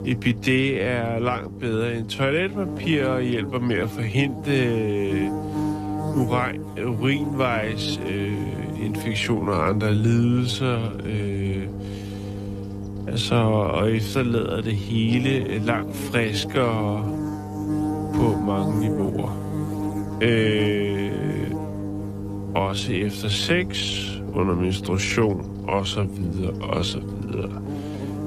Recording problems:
wrong speed, natural pitch; too slow; 0.6 times normal speed
electrical hum; loud; throughout; 50 Hz, 9 dB below the speech

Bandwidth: 14.5 kHz